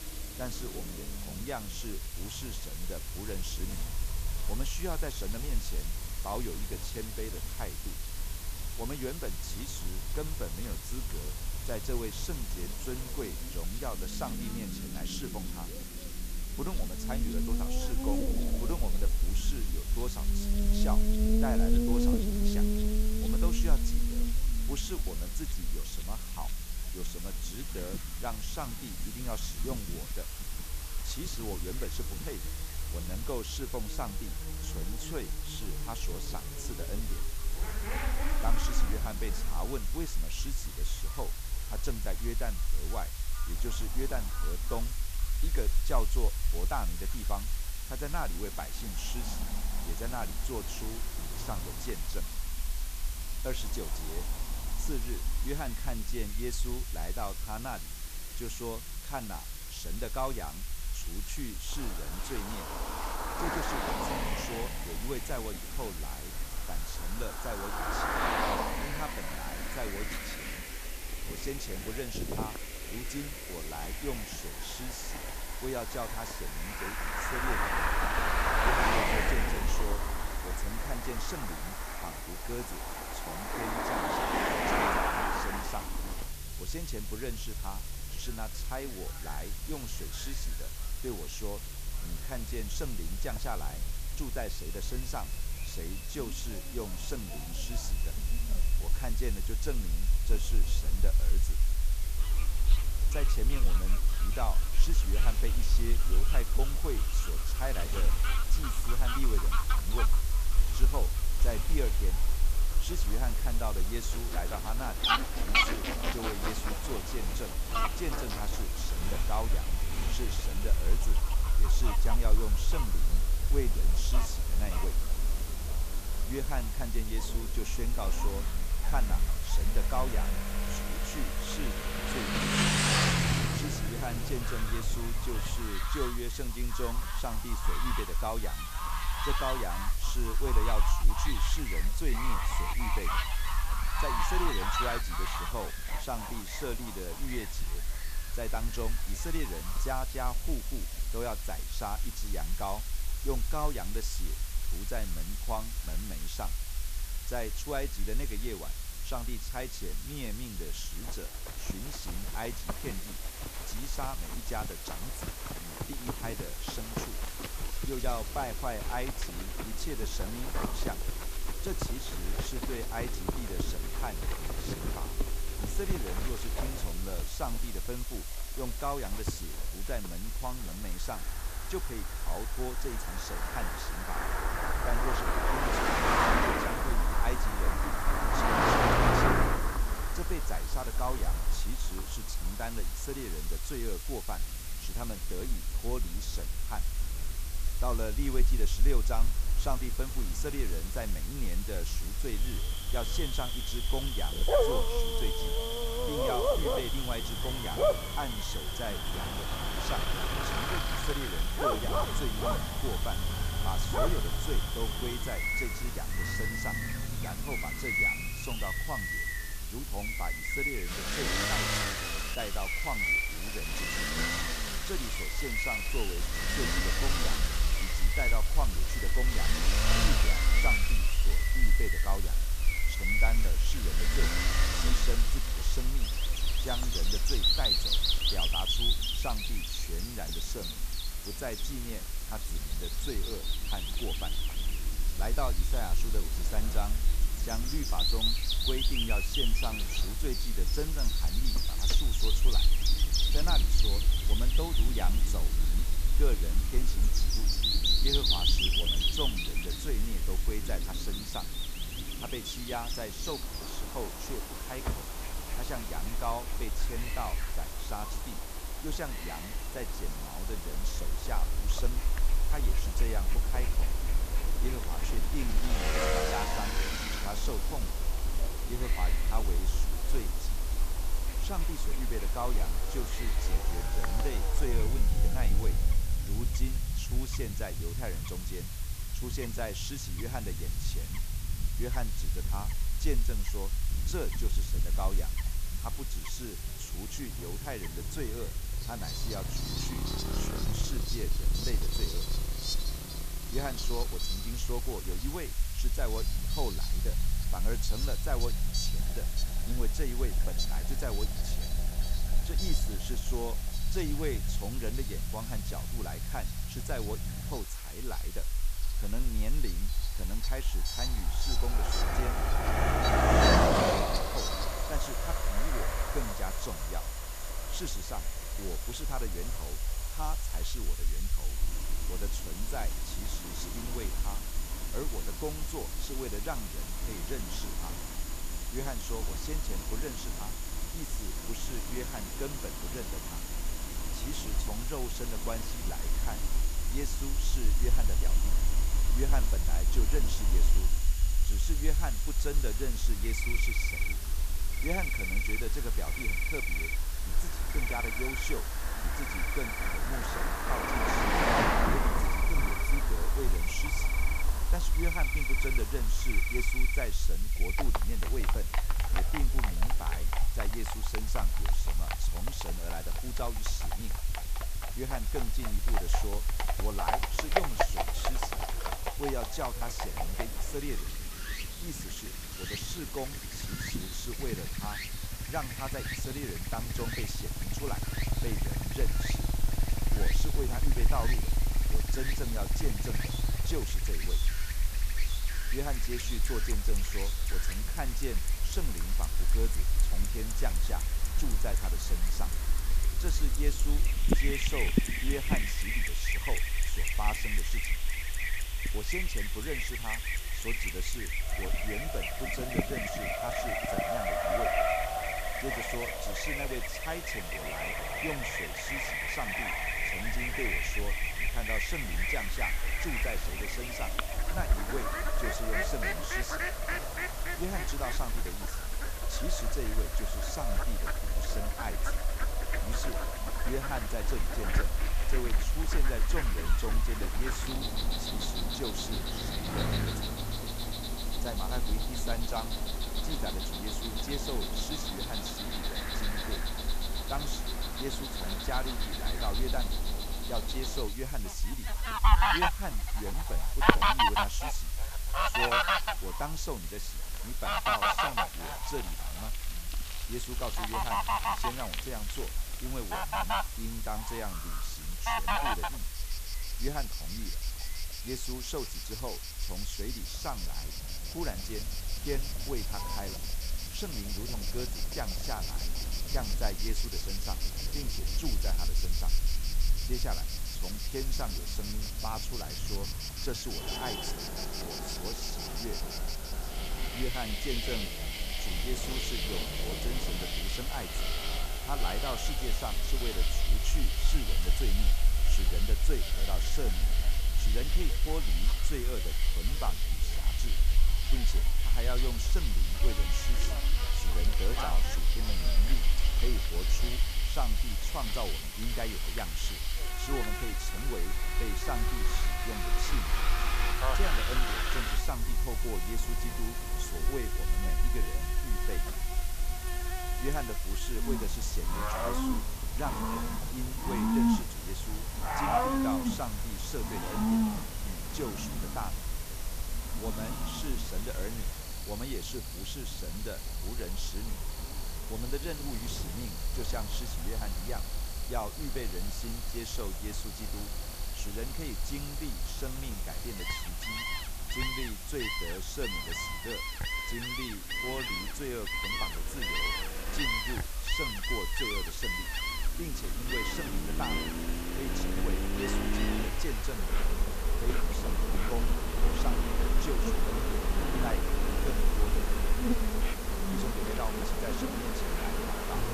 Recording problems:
animal sounds; very loud; throughout; 4 dB above the speech
traffic noise; very loud; throughout; 2 dB above the speech
hiss; loud; throughout; 2 dB below the speech
low rumble; noticeable; throughout; 20 dB below the speech

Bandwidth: 14.5 kHz